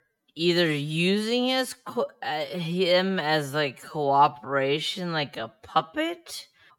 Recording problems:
wrong speed, natural pitch; too slow; 0.5 times normal speed

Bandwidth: 17 kHz